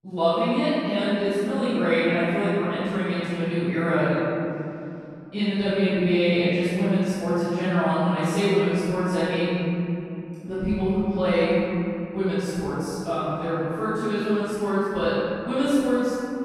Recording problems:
room echo; strong; dies away in 2.9 s
off-mic speech; far

